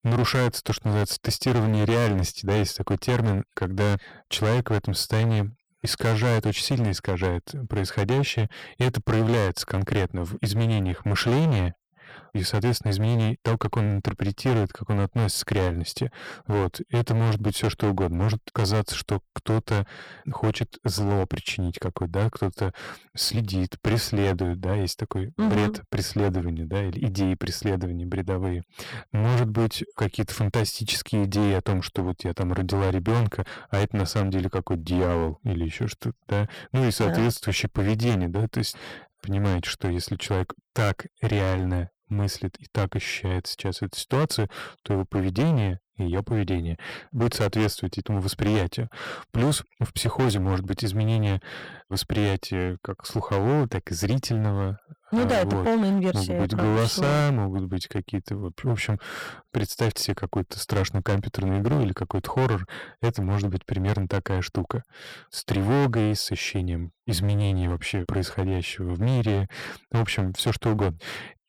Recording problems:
distortion; heavy; 14% of the sound clipped

